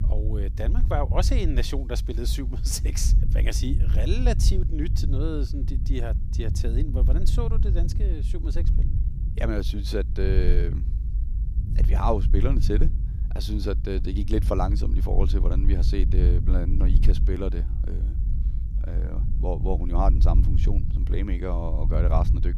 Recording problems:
low rumble; loud; throughout; 10 dB below the speech

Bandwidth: 15 kHz